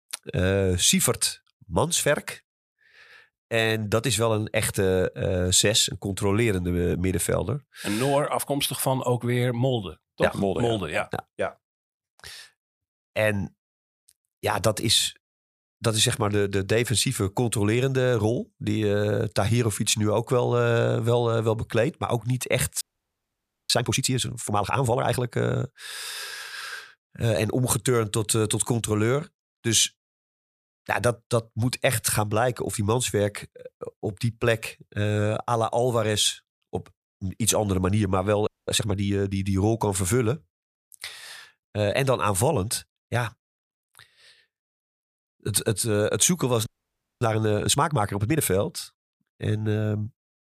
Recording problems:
audio freezing; at 23 s for 1 s, at 38 s and at 47 s for 0.5 s

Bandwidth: 15 kHz